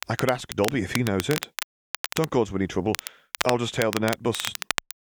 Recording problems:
crackle, like an old record; loud; 6 dB below the speech

